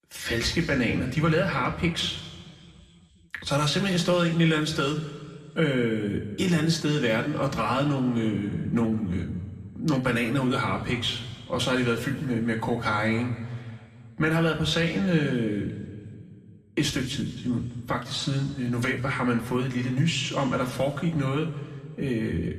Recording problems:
room echo; slight; dies away in 2 s
off-mic speech; somewhat distant

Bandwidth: 14 kHz